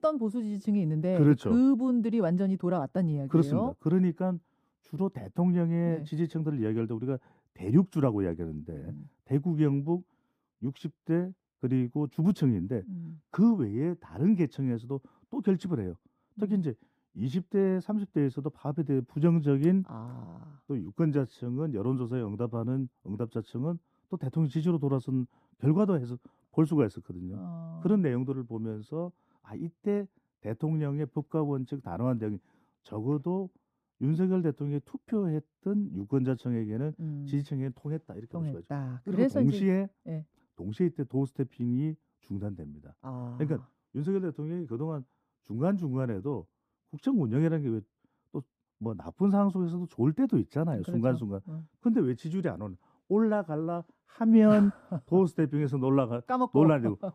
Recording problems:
muffled; slightly; fading above 1.5 kHz

